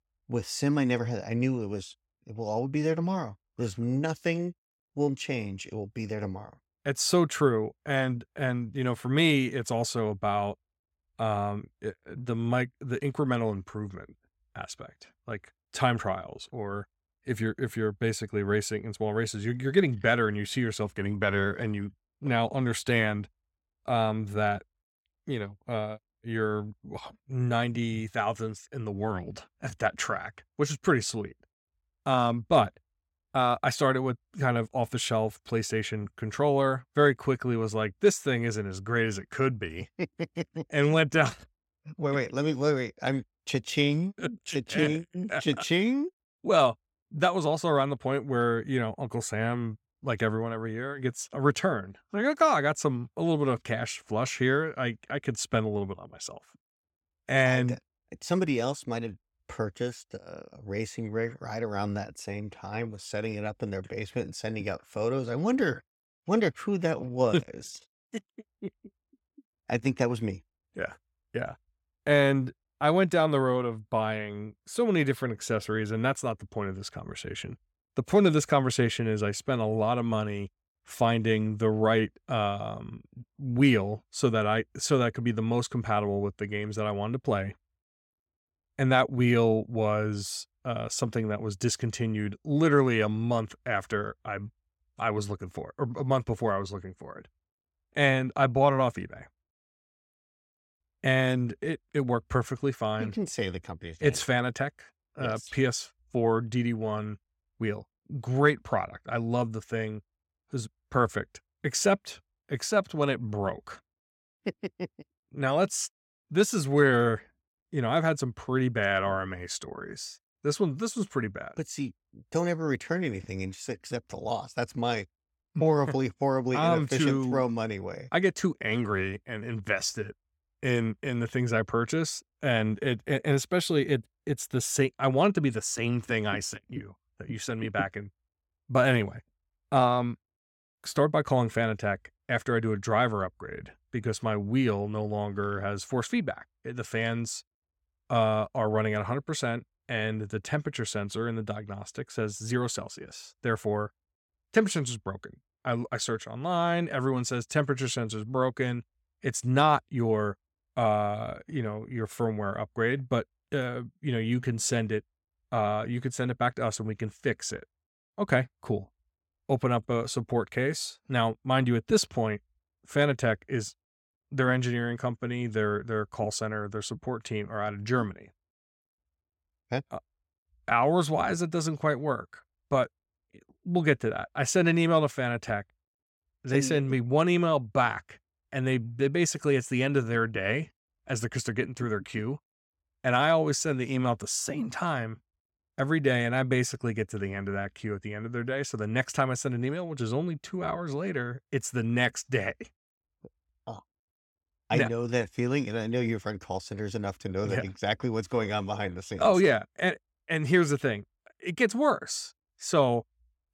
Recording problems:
none

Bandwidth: 16.5 kHz